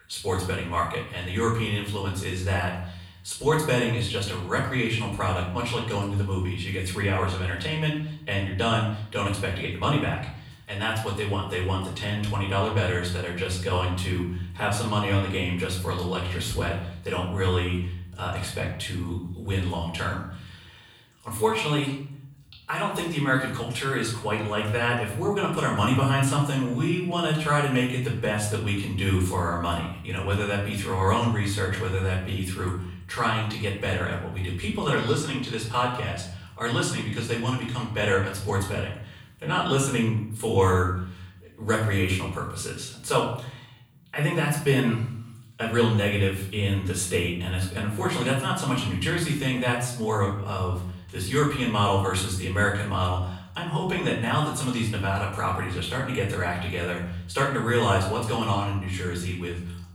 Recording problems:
off-mic speech; far
room echo; noticeable; dies away in 0.6 s

